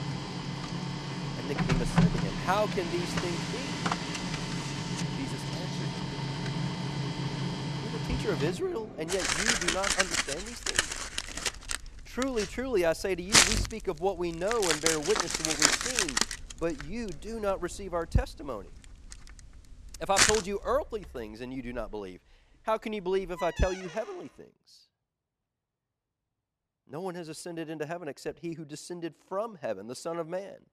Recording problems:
household noises; very loud; until 24 s; 4 dB above the speech

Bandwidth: 14 kHz